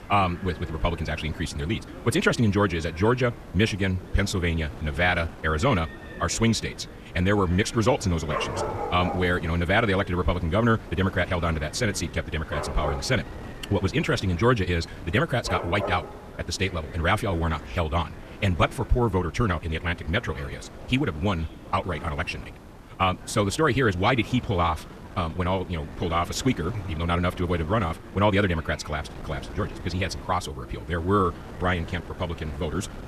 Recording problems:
wrong speed, natural pitch; too fast; 1.6 times normal speed
animal sounds; noticeable; throughout; 15 dB below the speech
wind noise on the microphone; occasional gusts; 20 dB below the speech
voice in the background; faint; throughout; 25 dB below the speech
hiss; faint; throughout; 30 dB below the speech

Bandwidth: 14 kHz